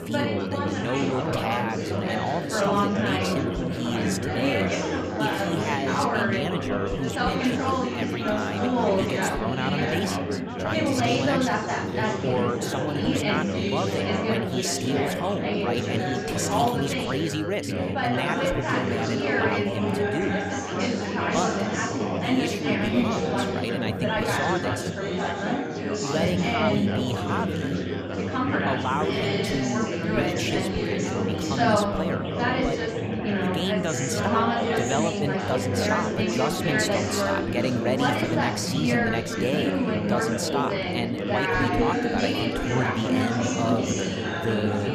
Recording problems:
chatter from many people; very loud; throughout; 5 dB above the speech

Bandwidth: 15 kHz